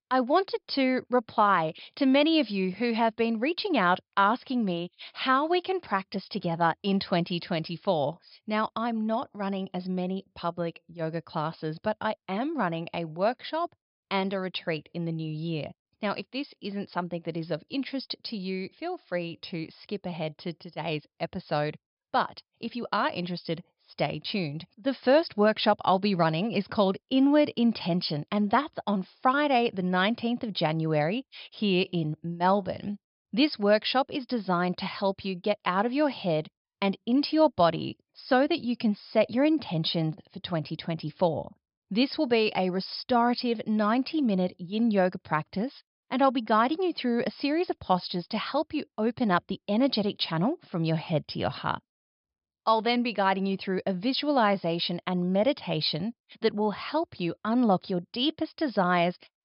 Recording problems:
high frequencies cut off; noticeable; nothing above 5 kHz

